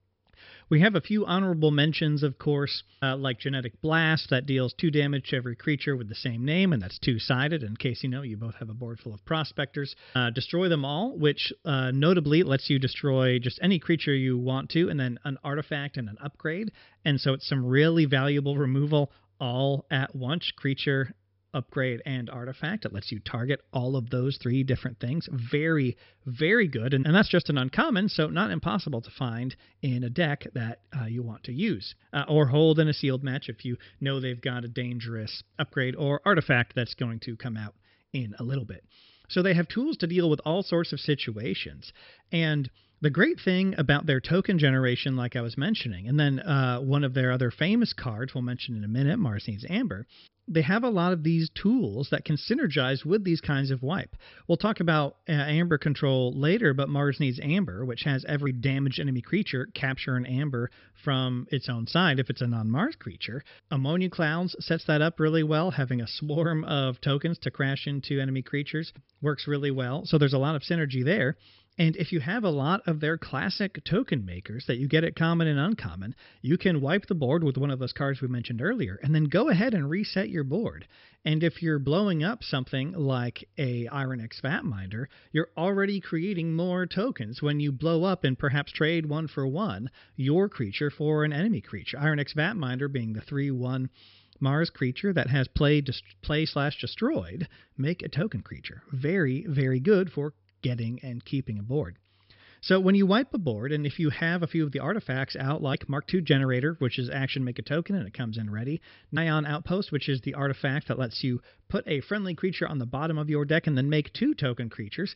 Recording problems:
high frequencies cut off; noticeable; nothing above 5.5 kHz

